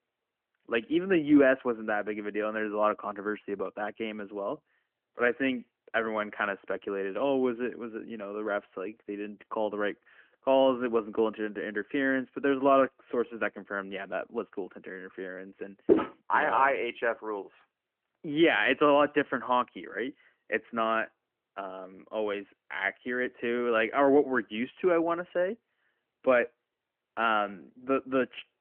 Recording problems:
phone-call audio; nothing above 3 kHz
footsteps; loud; at 16 s; peak 2 dB above the speech

